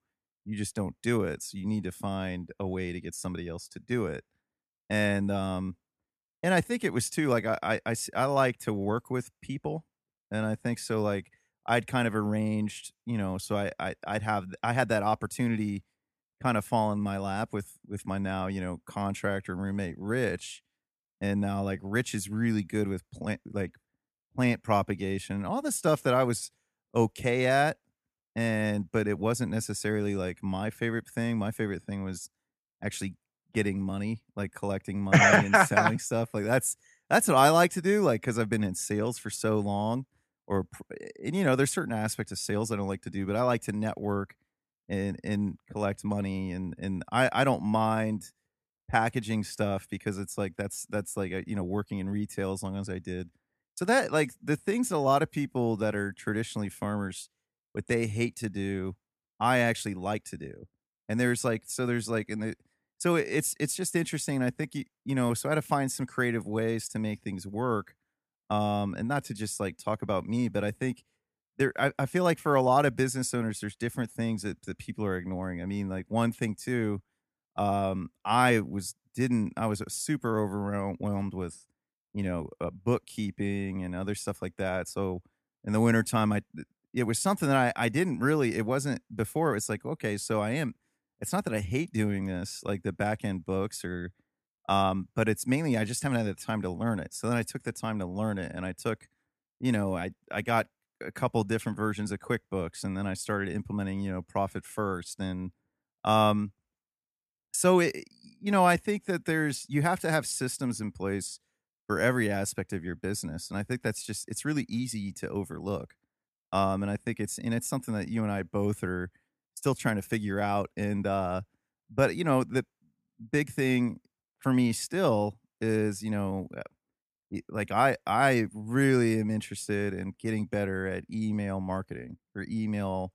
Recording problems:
none

